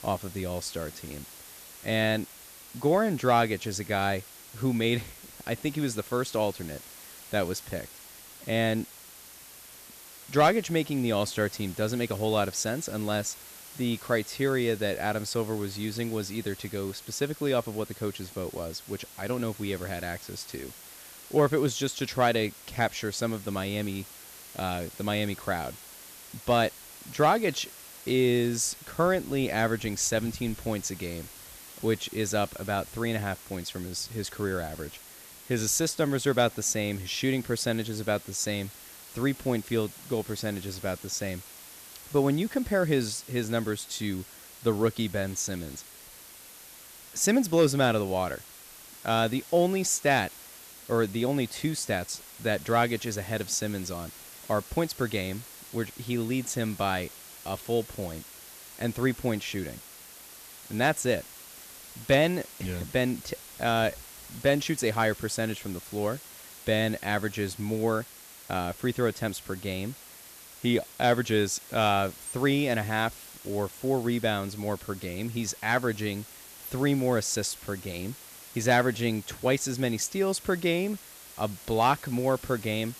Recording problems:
hiss; noticeable; throughout; 15 dB below the speech

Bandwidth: 14.5 kHz